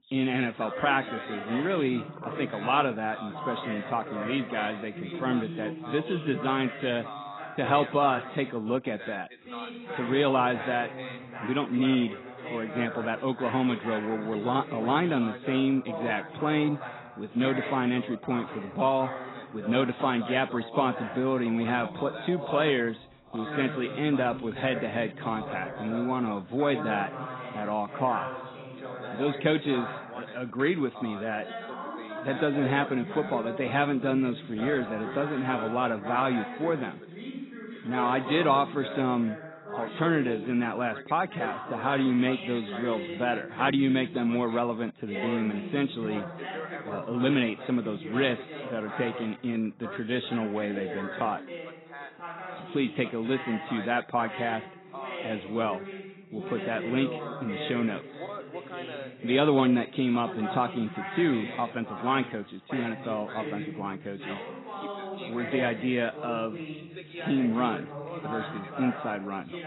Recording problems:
garbled, watery; badly; nothing above 4 kHz
background chatter; loud; throughout; 2 voices, 10 dB below the speech

